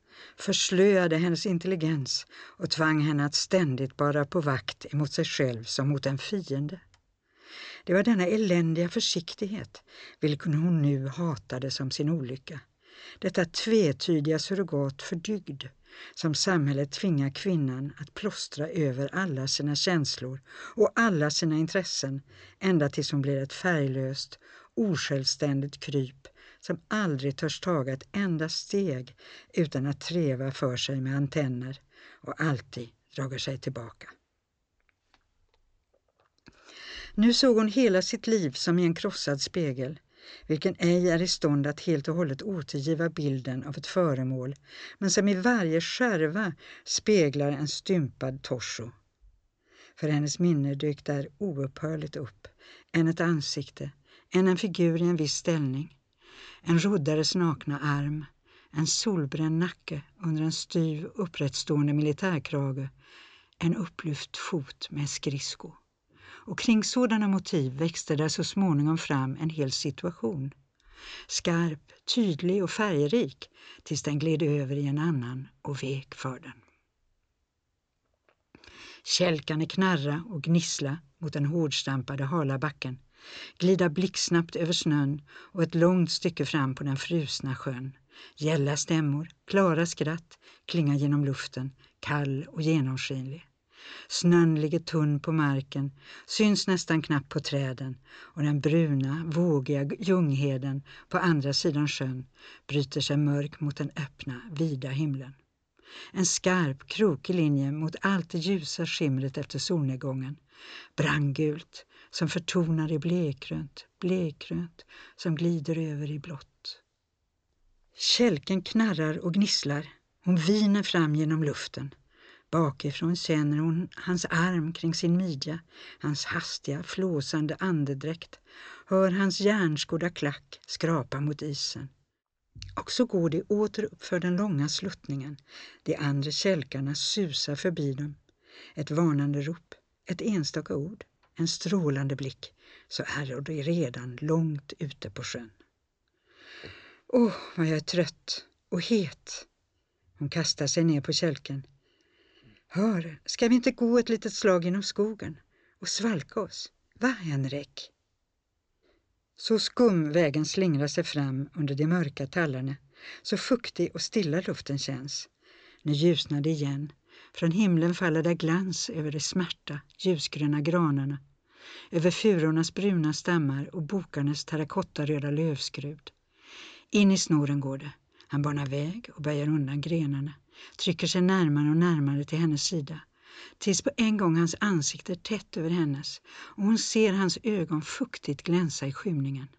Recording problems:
high frequencies cut off; noticeable; nothing above 8 kHz

